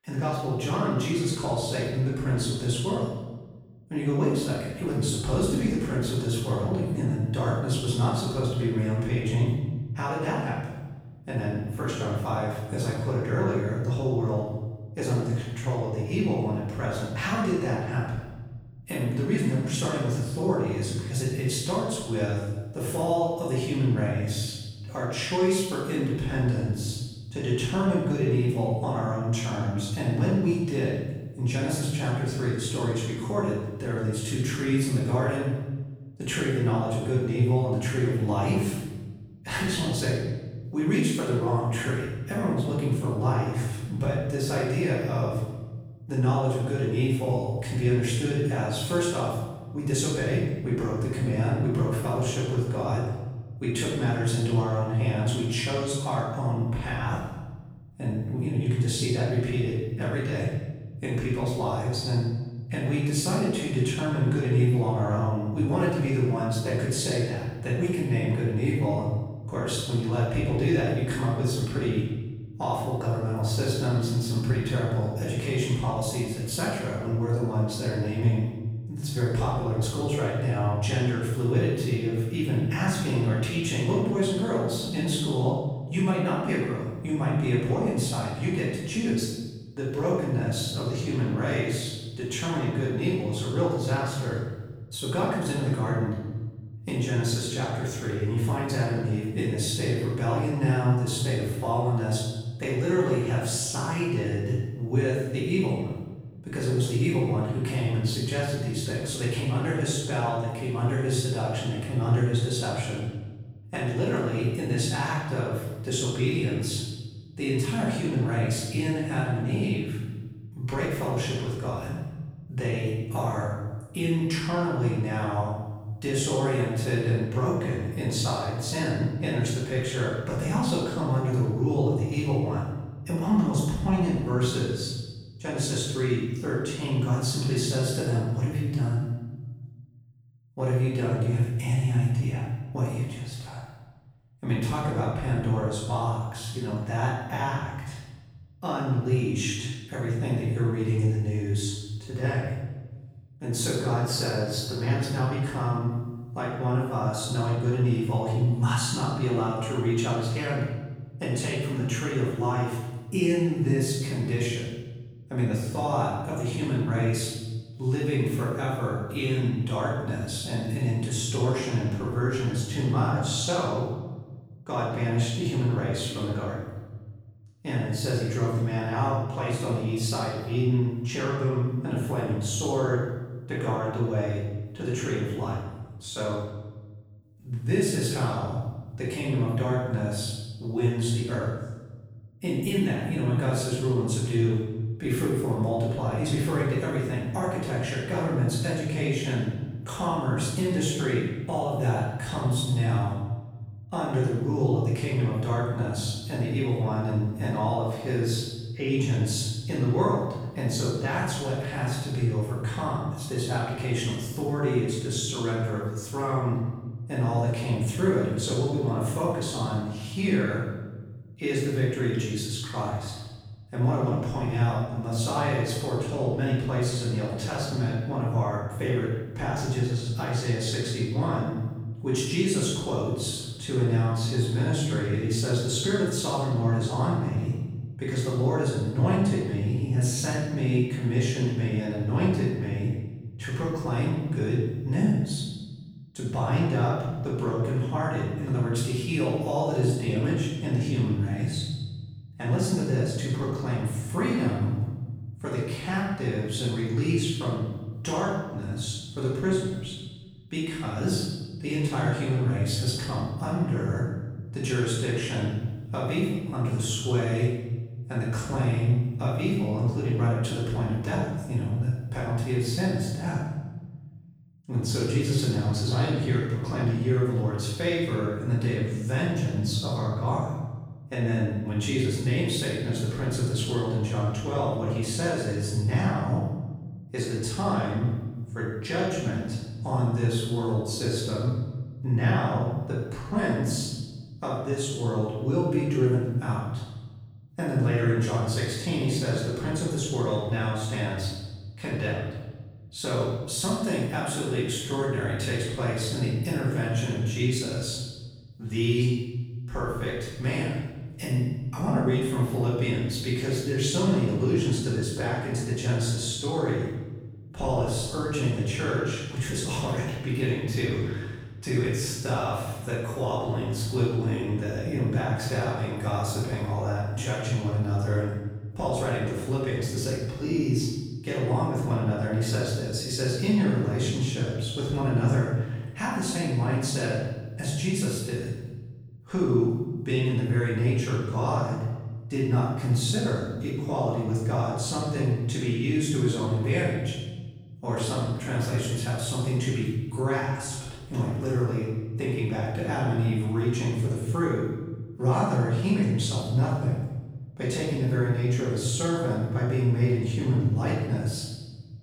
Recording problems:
room echo; strong; dies away in 1.2 s
off-mic speech; far

